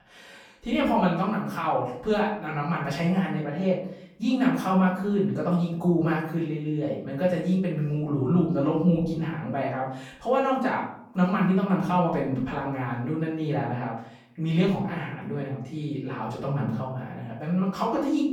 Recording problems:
off-mic speech; far
room echo; noticeable; dies away in 0.5 s

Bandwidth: 18.5 kHz